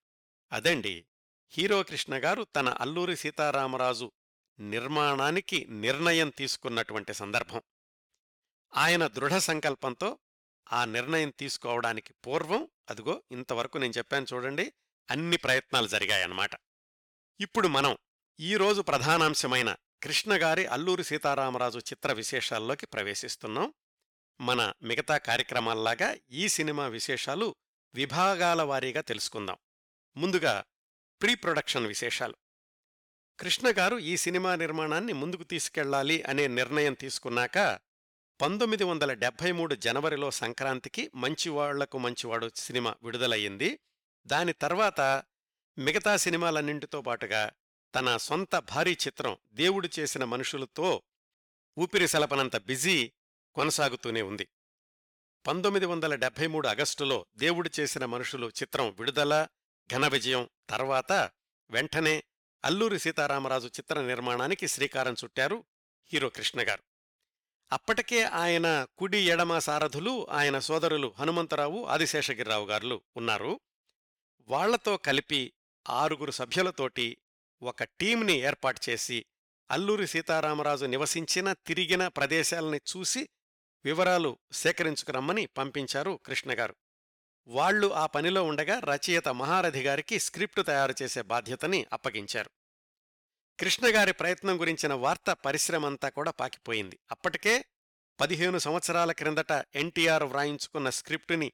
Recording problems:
none

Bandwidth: 18.5 kHz